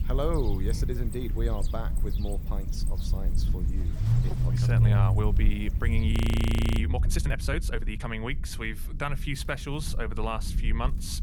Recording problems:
low rumble; loud; throughout; 8 dB below the speech
animal sounds; noticeable; throughout; 15 dB below the speech
audio freezing; at 6 s for 0.5 s

